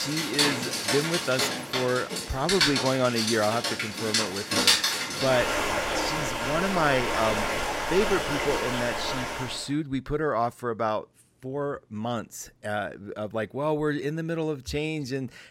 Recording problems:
rain or running water; very loud; until 9.5 s; 2 dB above the speech
abrupt cut into speech; at the start

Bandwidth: 16.5 kHz